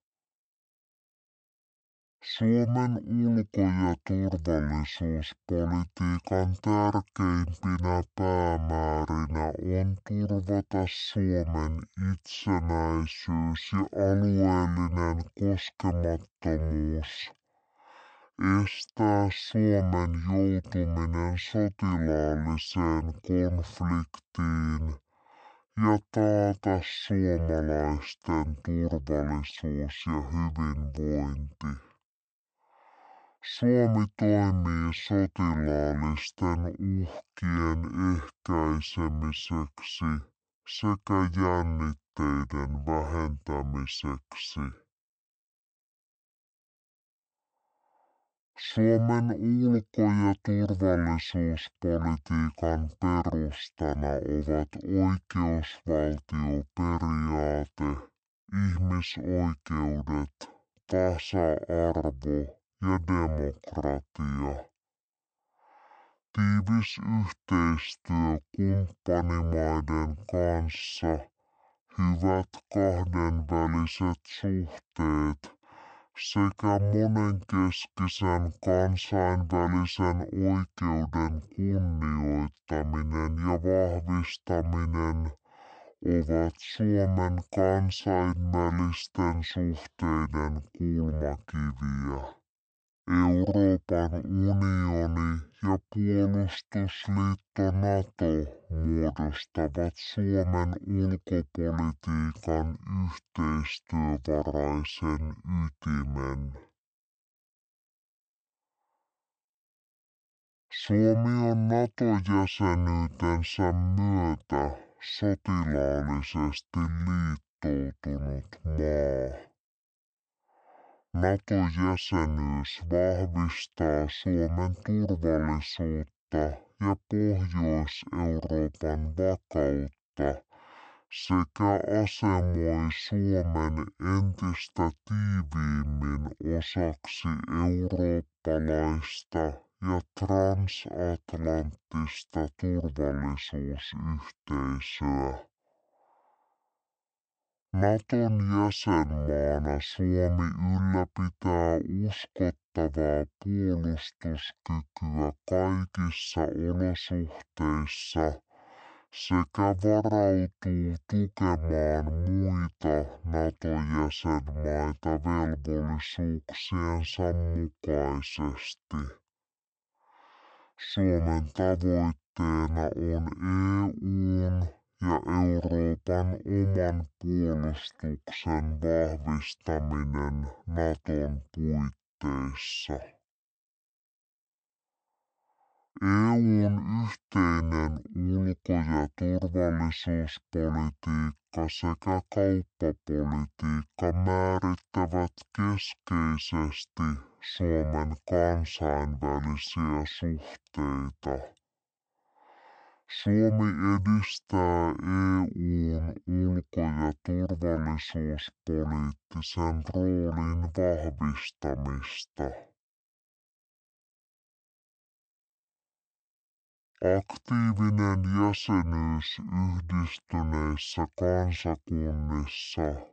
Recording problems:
wrong speed and pitch; too slow and too low; 0.5 times normal speed

